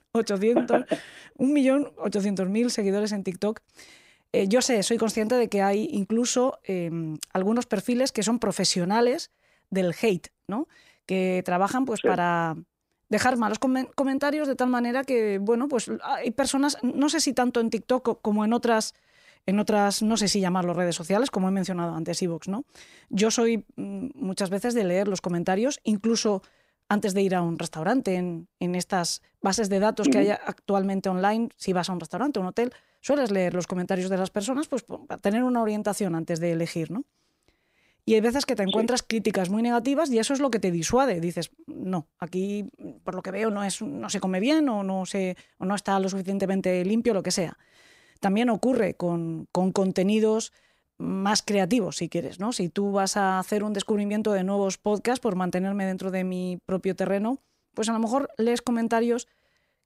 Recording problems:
none

